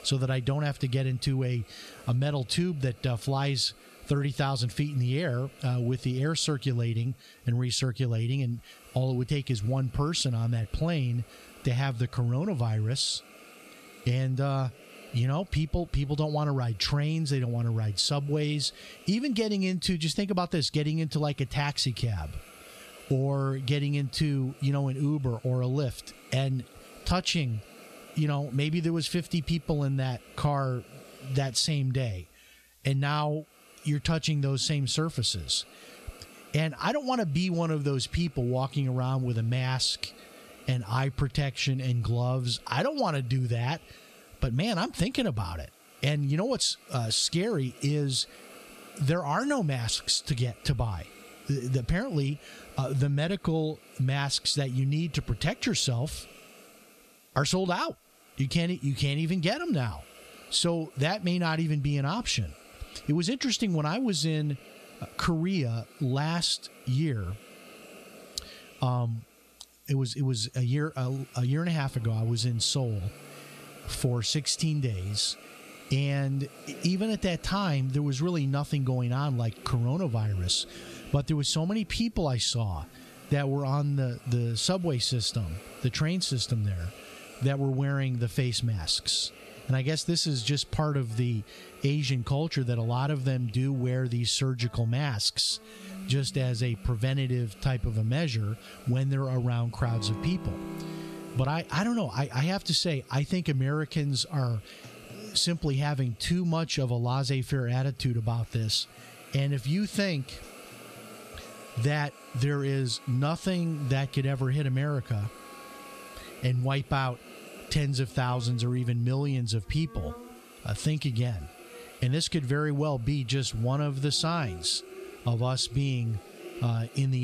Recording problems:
squashed, flat; somewhat, background pumping
background music; faint; from 1:12 on; 20 dB below the speech
hiss; faint; throughout; 25 dB below the speech
abrupt cut into speech; at the end

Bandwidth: 14 kHz